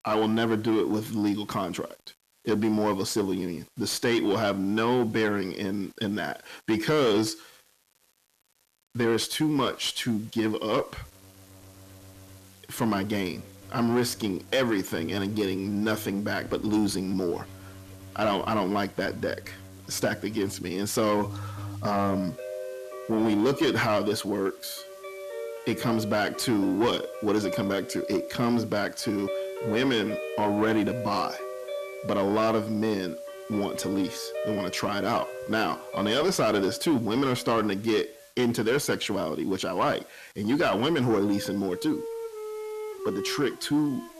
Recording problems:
distortion; slight; 10 dB below the speech
background music; noticeable; throughout; 10 dB below the speech
hiss; faint; throughout; 25 dB below the speech

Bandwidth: 14 kHz